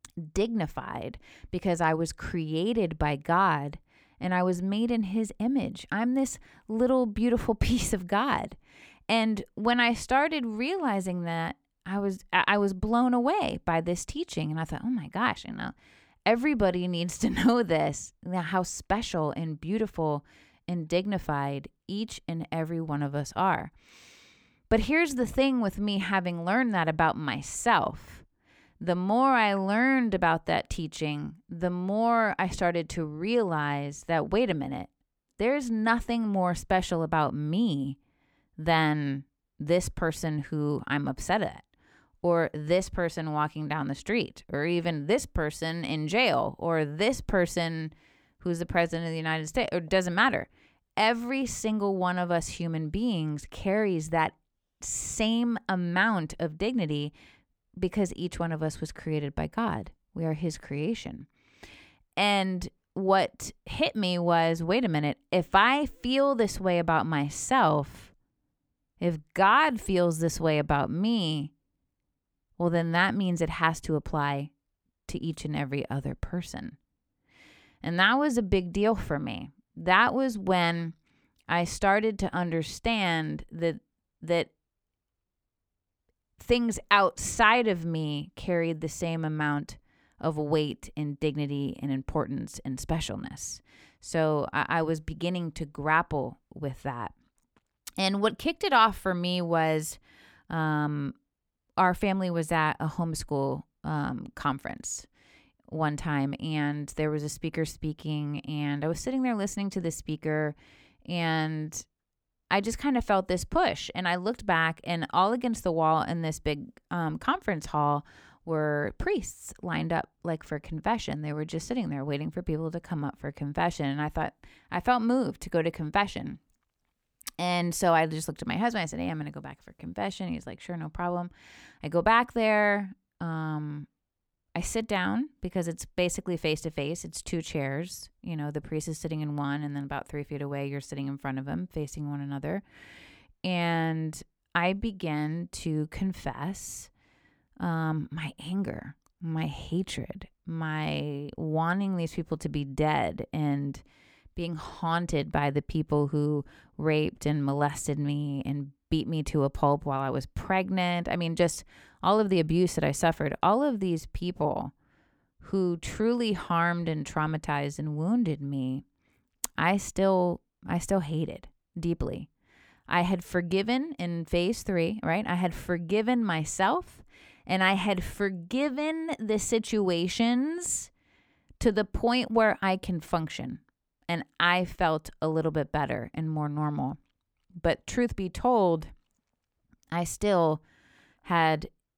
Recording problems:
none

